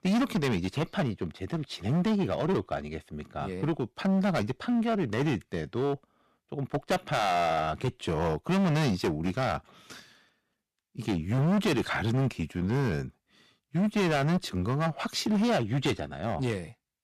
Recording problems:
distortion; heavy; 14% of the sound clipped

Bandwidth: 14.5 kHz